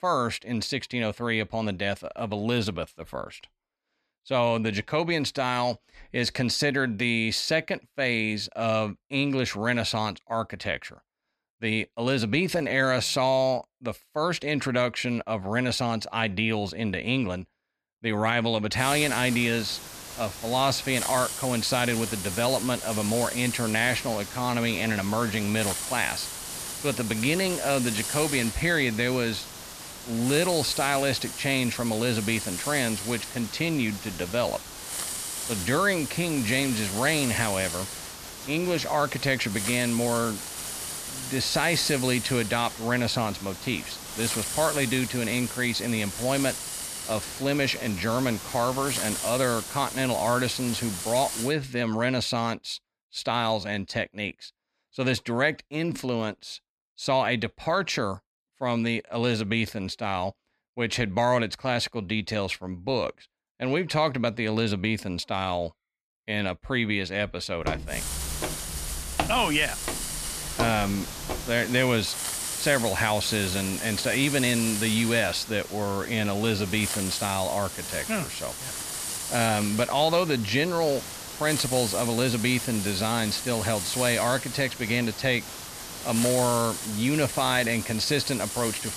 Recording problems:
hiss; loud; from 19 to 51 s and from 1:08 on; 6 dB below the speech
footsteps; noticeable; from 1:08 to 1:11; peak 4 dB below the speech

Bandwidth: 14.5 kHz